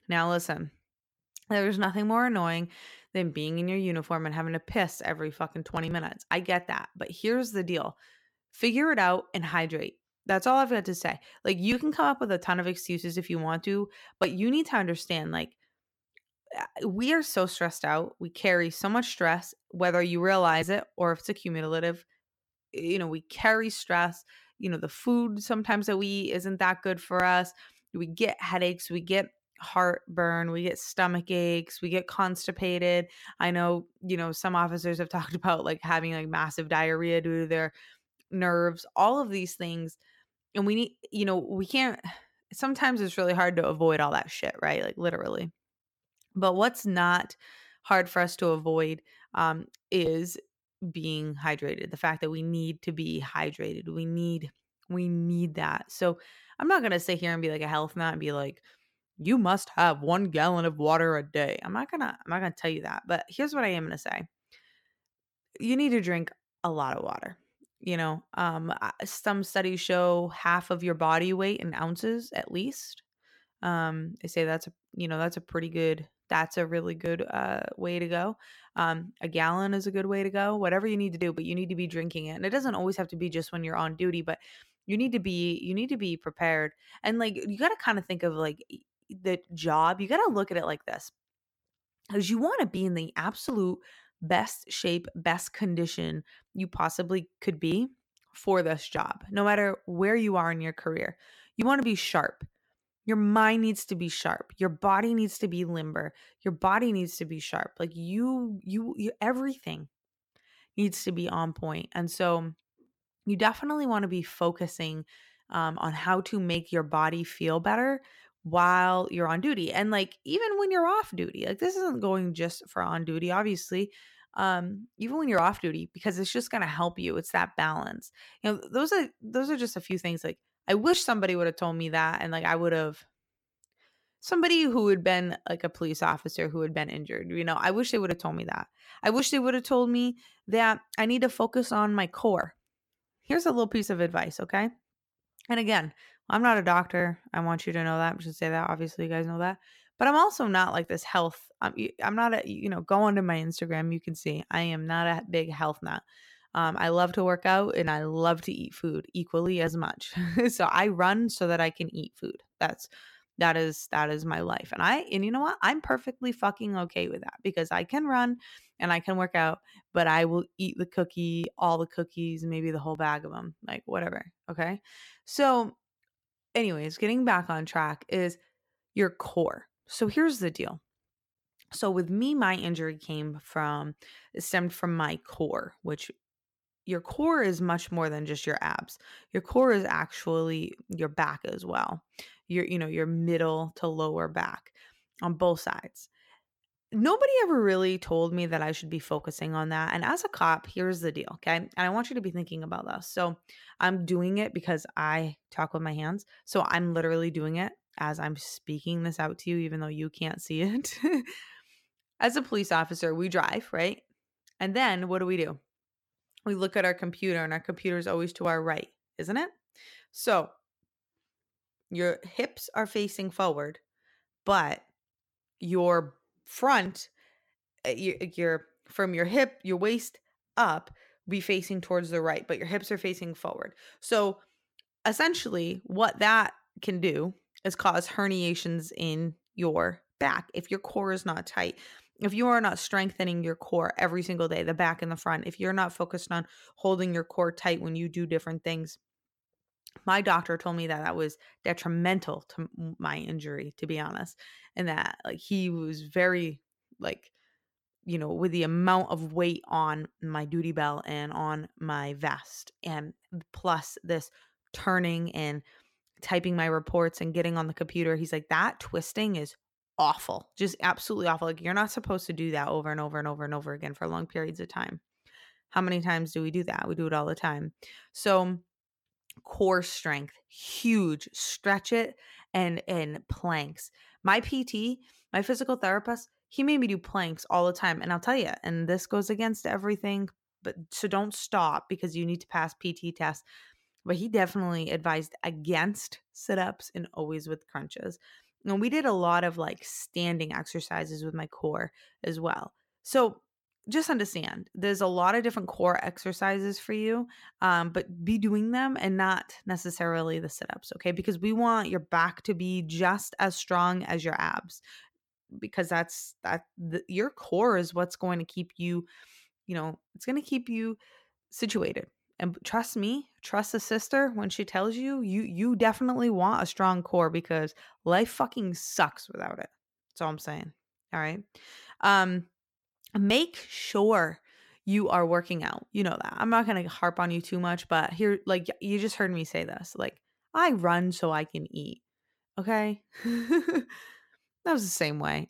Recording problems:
none

